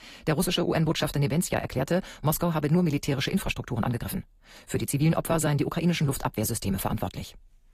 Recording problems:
wrong speed, natural pitch; too fast; 1.5 times normal speed
garbled, watery; slightly; nothing above 14.5 kHz

